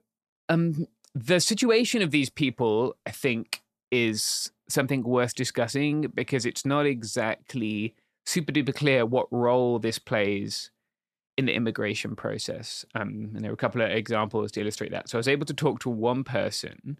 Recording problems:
none

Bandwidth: 14 kHz